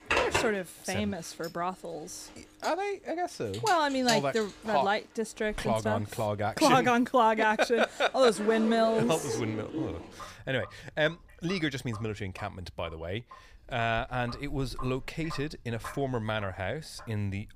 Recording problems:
household noises; loud; throughout; 9 dB below the speech

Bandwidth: 15 kHz